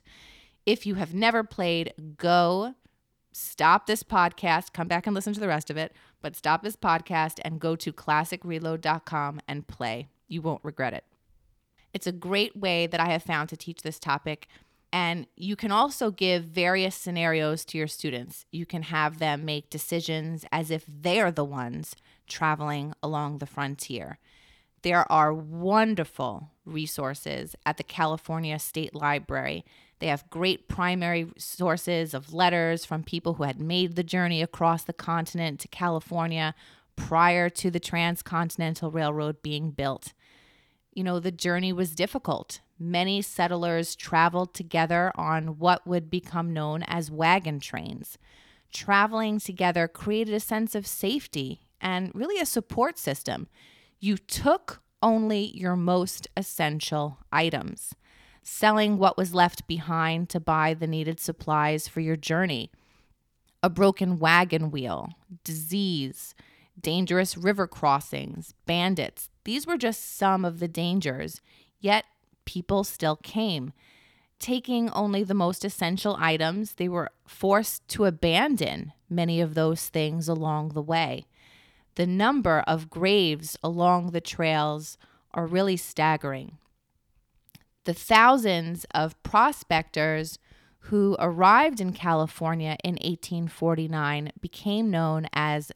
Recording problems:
none

